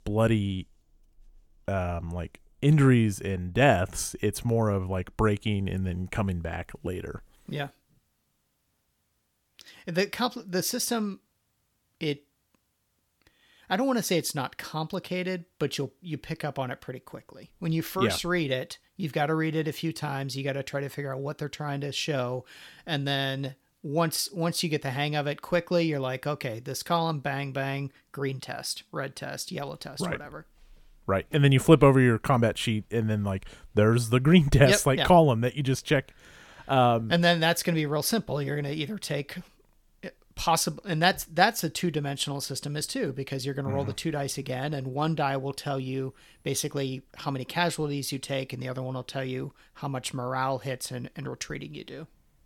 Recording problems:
none

